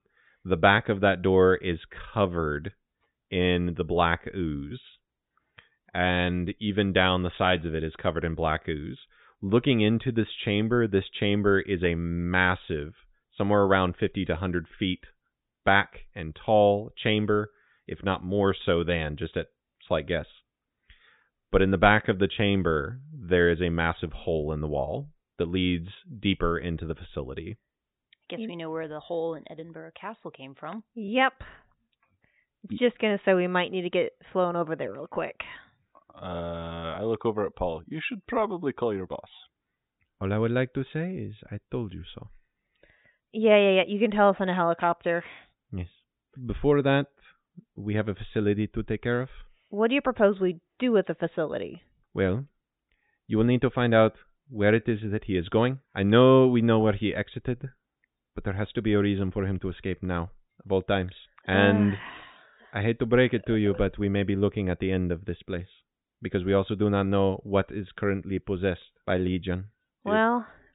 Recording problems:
high frequencies cut off; severe; nothing above 4 kHz

